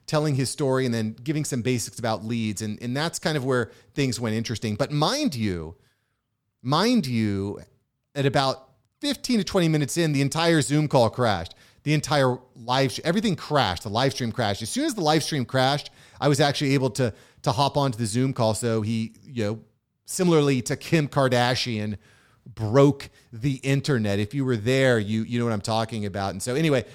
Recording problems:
none

